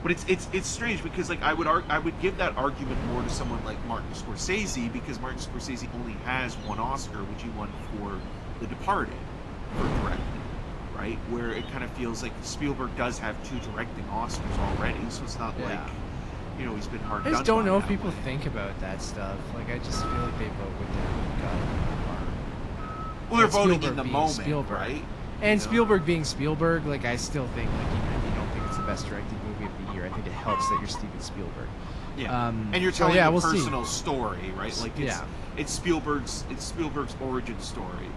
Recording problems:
garbled, watery; slightly; nothing above 11 kHz
animal sounds; noticeable; throughout; 10 dB below the speech
wind noise on the microphone; occasional gusts; 10 dB below the speech

